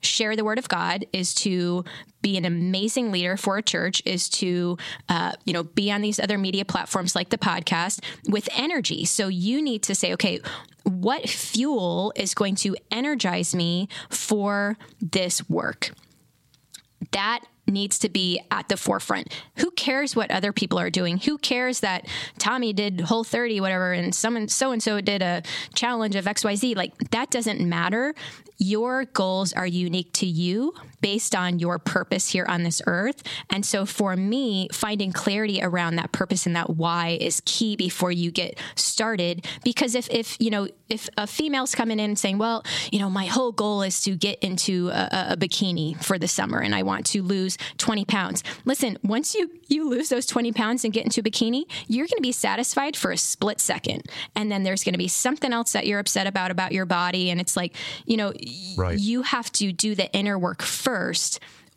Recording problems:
squashed, flat; somewhat

